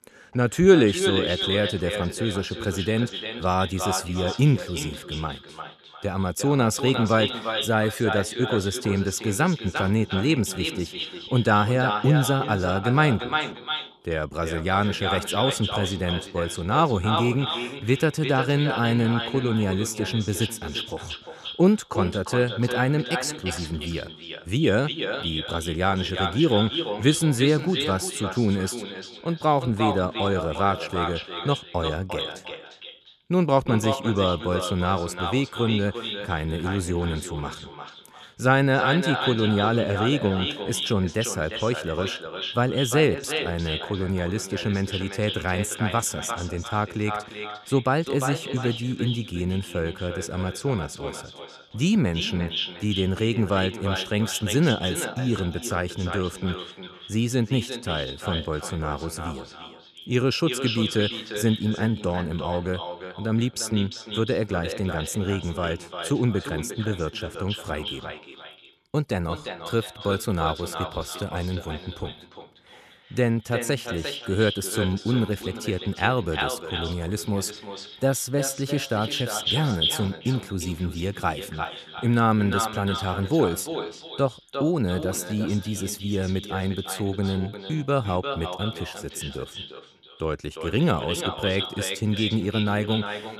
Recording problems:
echo of what is said; strong; throughout; 350 ms later, 6 dB below the speech

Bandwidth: 13.5 kHz